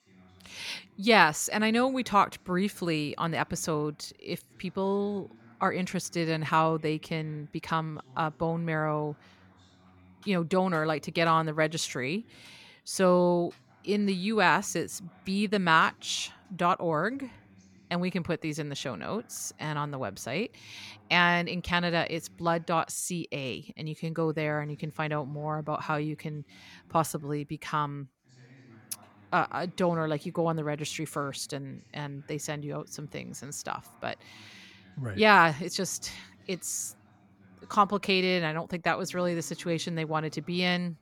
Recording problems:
background chatter; faint; throughout; 2 voices, 30 dB below the speech

